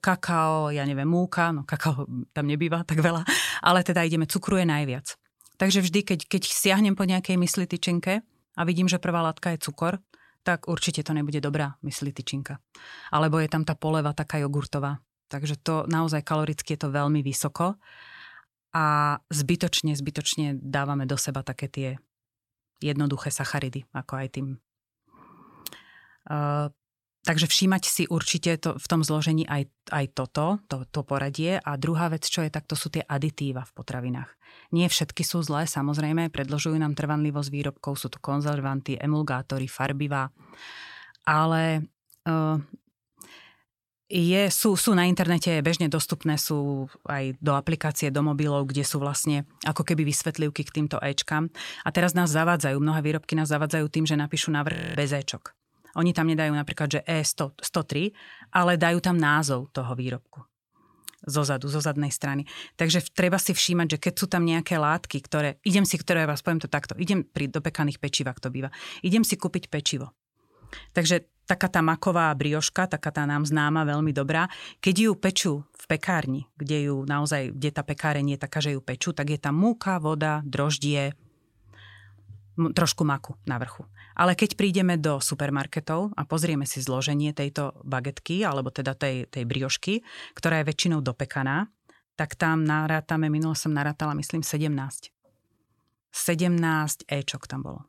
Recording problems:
audio freezing; at 55 s

